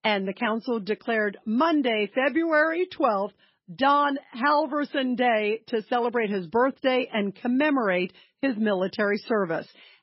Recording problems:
garbled, watery; badly; nothing above 5.5 kHz

